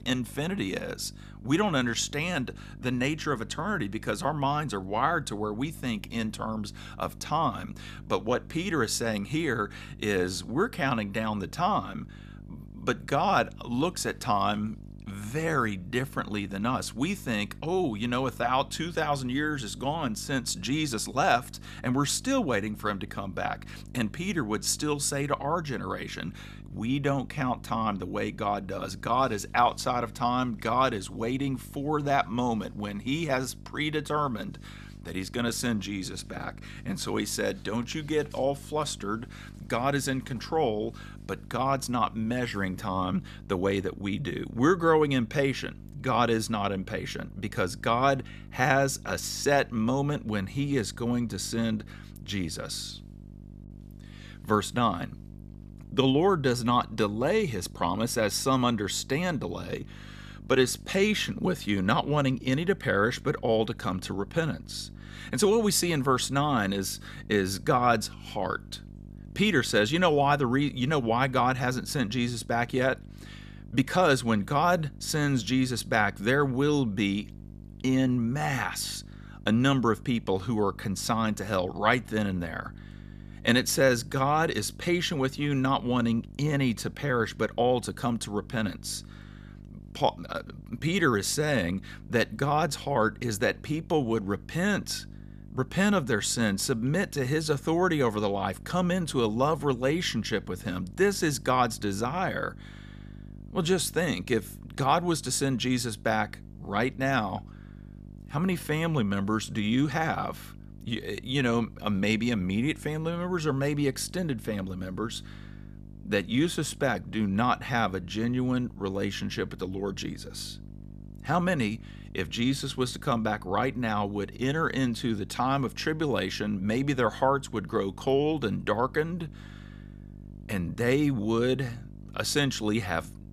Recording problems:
electrical hum; faint; throughout; 50 Hz, 25 dB below the speech

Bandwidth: 14.5 kHz